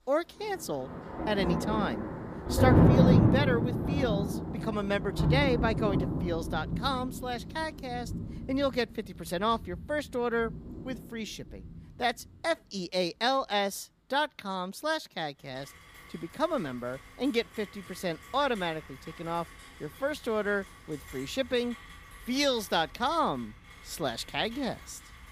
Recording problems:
rain or running water; very loud; throughout; 3 dB above the speech

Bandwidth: 15 kHz